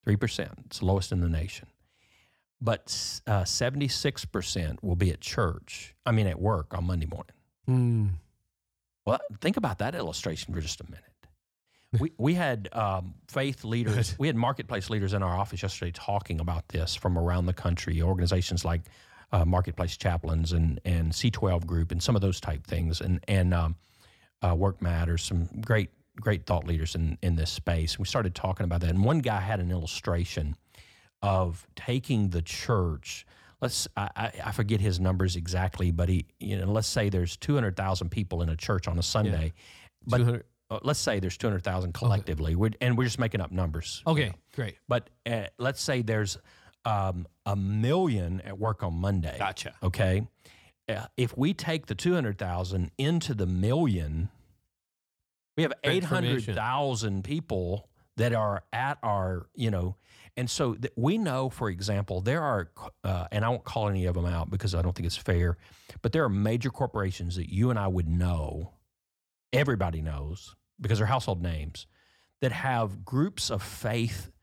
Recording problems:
none

